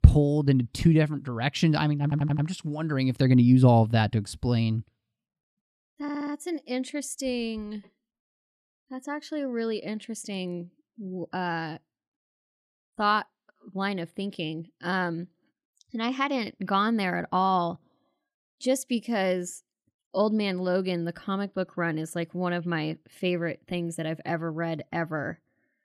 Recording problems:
audio stuttering; at 2 s and at 6 s

